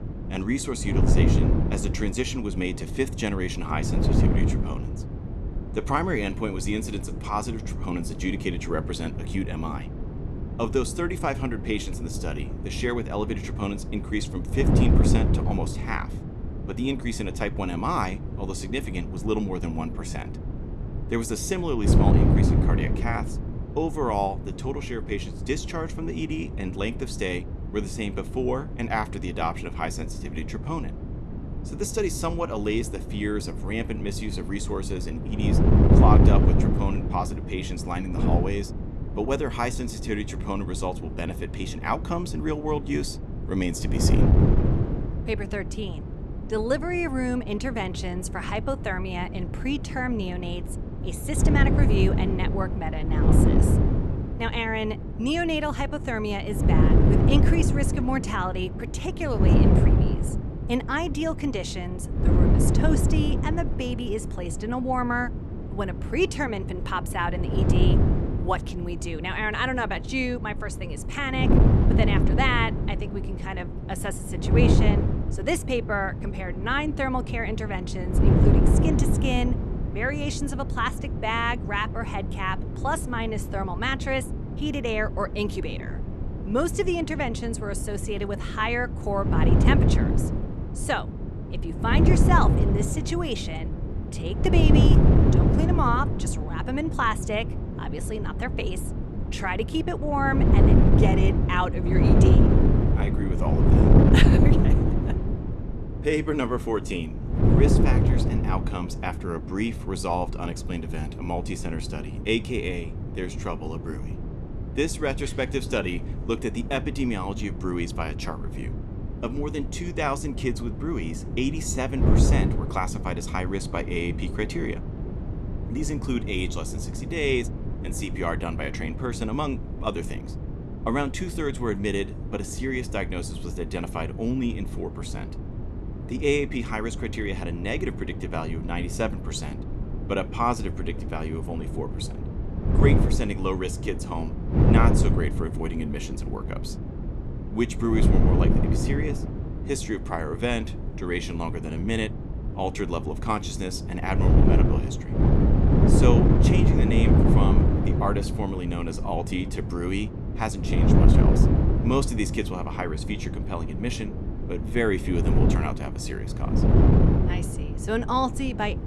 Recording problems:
wind noise on the microphone; heavy; 5 dB below the speech

